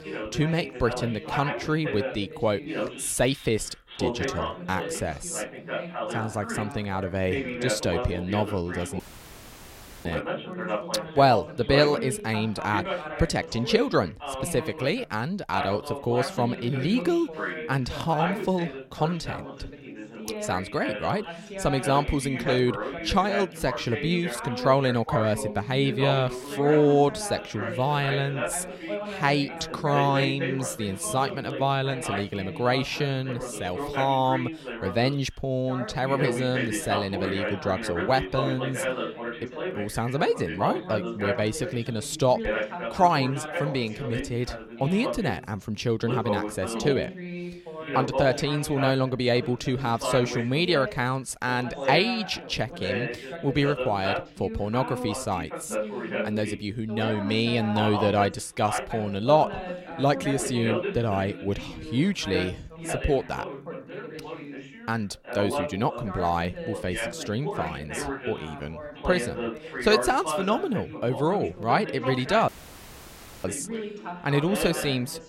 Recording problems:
background chatter; loud; throughout; 2 voices, 6 dB below the speech
audio cutting out; at 9 s for 1 s and at 1:12 for 1 s

